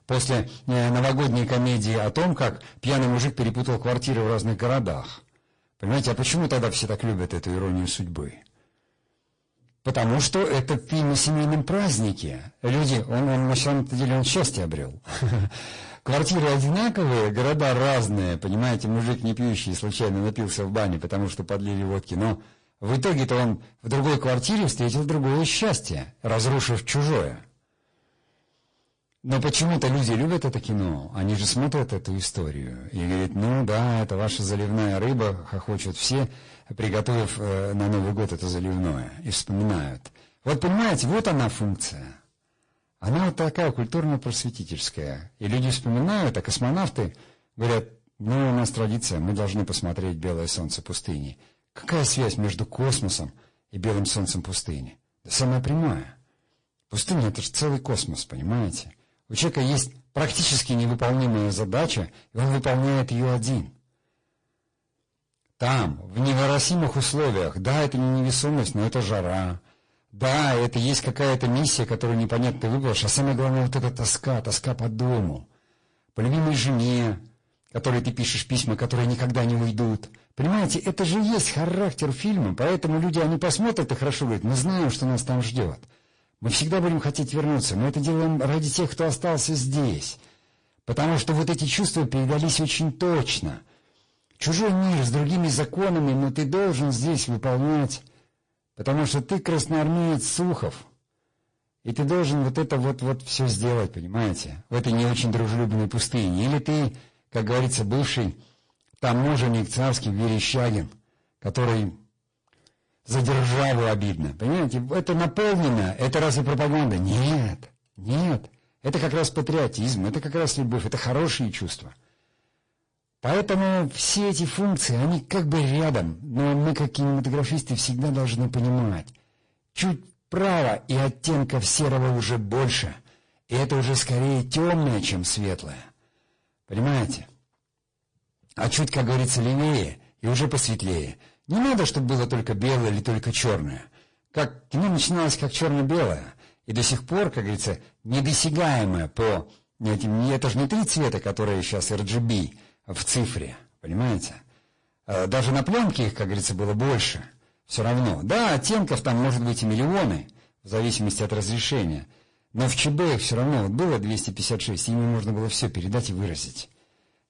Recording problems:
distortion; heavy; 21% of the sound clipped
garbled, watery; slightly

